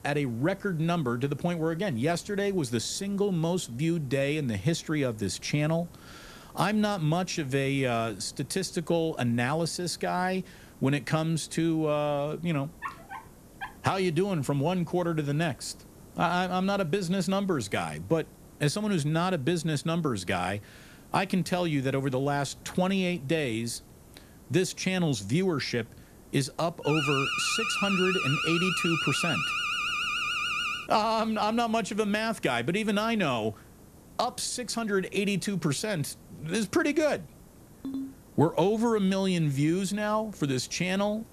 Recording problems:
hiss; faint; throughout; 25 dB below the speech
dog barking; faint; at 13 s; peak 10 dB below the speech
alarm; loud; from 27 to 31 s; peak 1 dB above the speech
phone ringing; noticeable; at 38 s; peak 8 dB below the speech

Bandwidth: 14 kHz